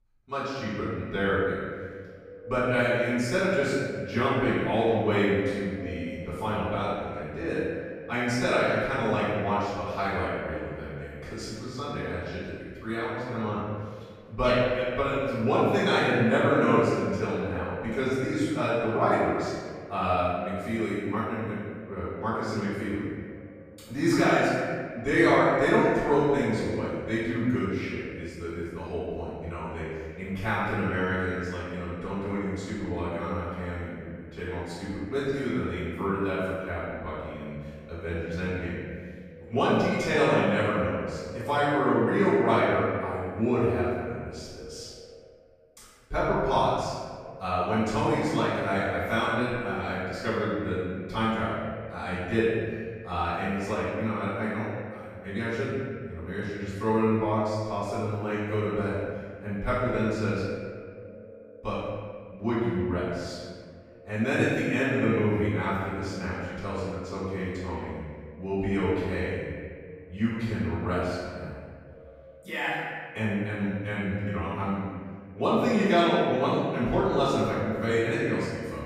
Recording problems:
room echo; strong; dies away in 1.6 s
off-mic speech; far
echo of what is said; faint; throughout; 310 ms later, 20 dB below the speech

